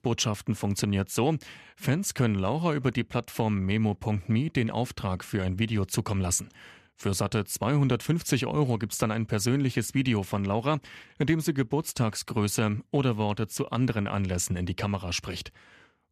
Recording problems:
none

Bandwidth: 14.5 kHz